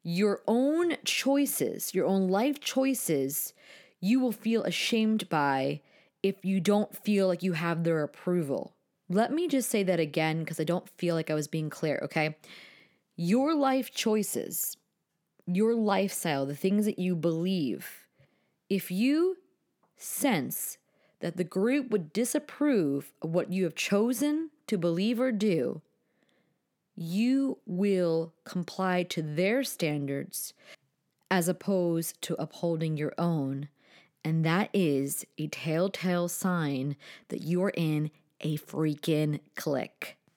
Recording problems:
none

